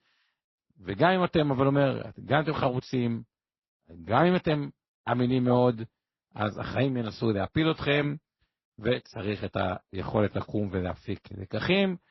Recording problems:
garbled, watery; slightly; nothing above 5.5 kHz

